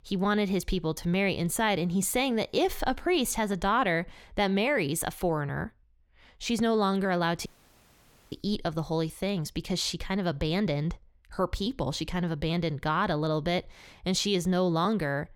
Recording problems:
audio cutting out; at 7.5 s for 1 s

